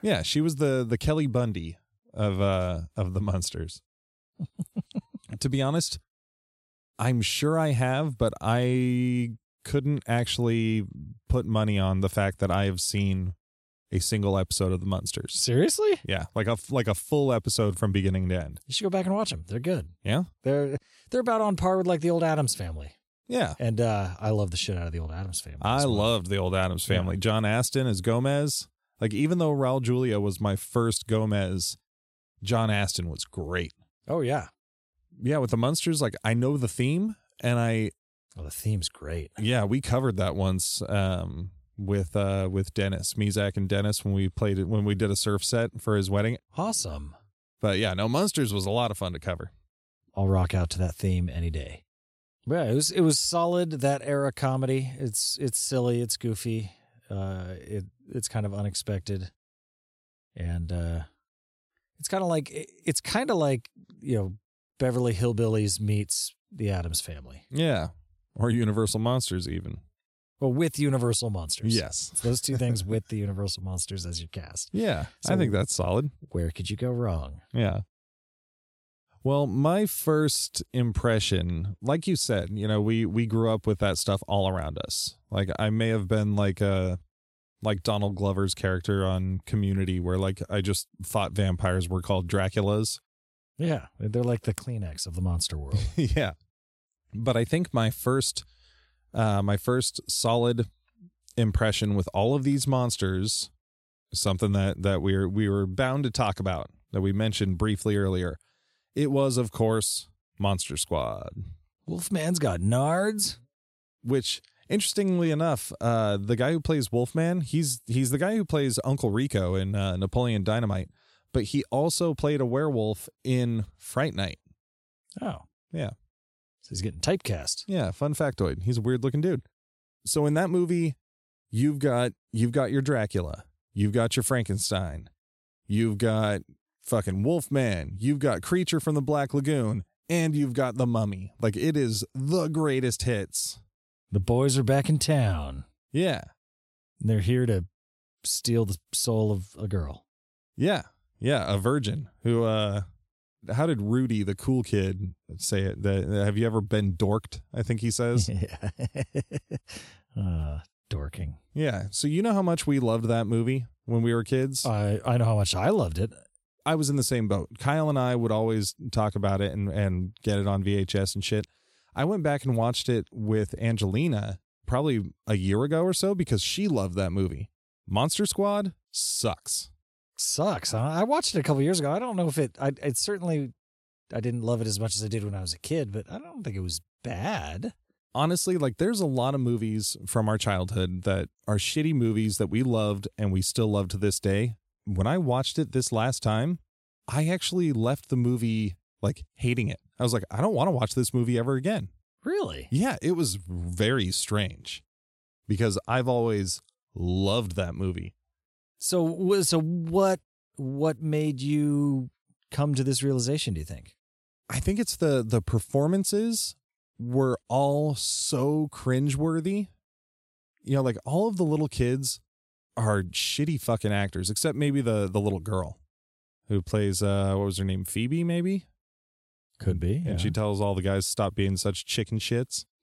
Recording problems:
none

